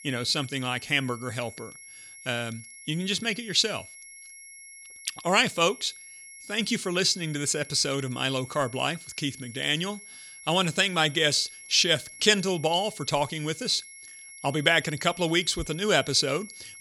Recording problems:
high-pitched whine; noticeable; throughout; 2 kHz, 20 dB below the speech

